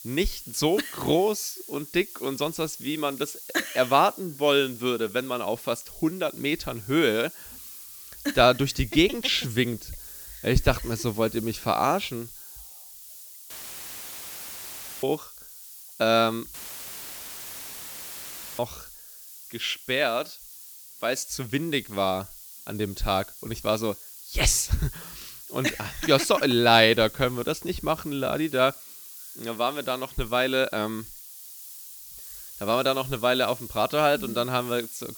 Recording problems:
hiss; noticeable; throughout; 15 dB below the speech
audio cutting out; filled with static; at 14 s for 1.5 s and at 17 s for 2 s

